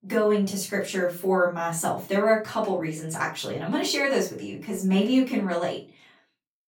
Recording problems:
off-mic speech; far
room echo; slight; dies away in 0.3 s

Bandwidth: 18.5 kHz